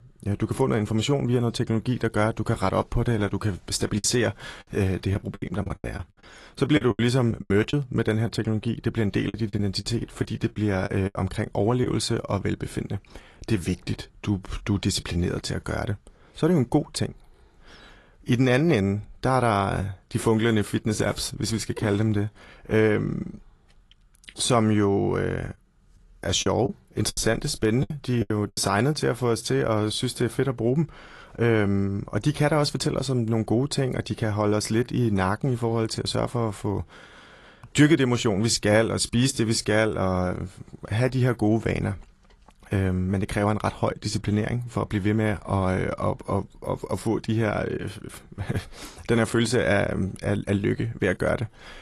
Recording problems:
garbled, watery; slightly; nothing above 11.5 kHz
choppy; very; from 4 to 7.5 s, from 9.5 to 12 s and from 26 to 29 s; 15% of the speech affected

